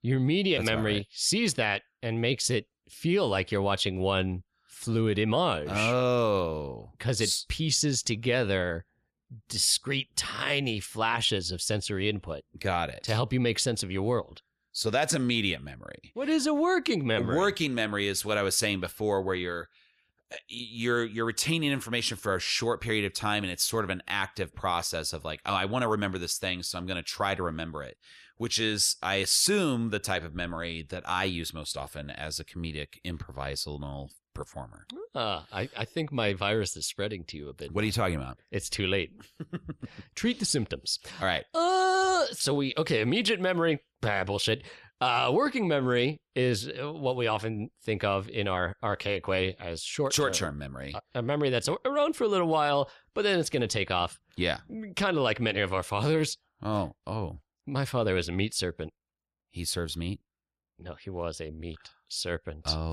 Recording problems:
abrupt cut into speech; at the end

